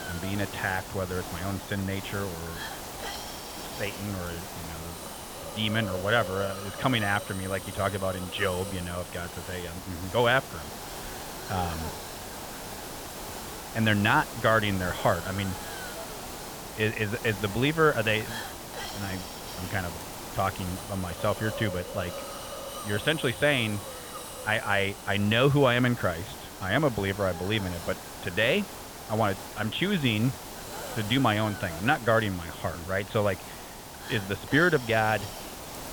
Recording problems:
high frequencies cut off; severe; nothing above 4 kHz
hiss; loud; throughout; 10 dB below the speech

